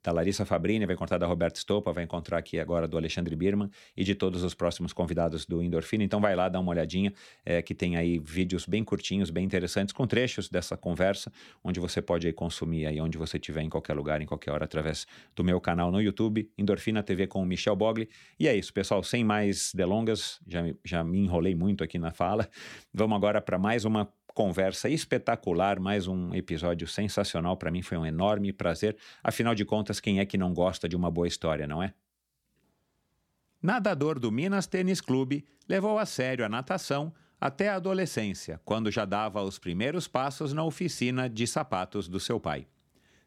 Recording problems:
none

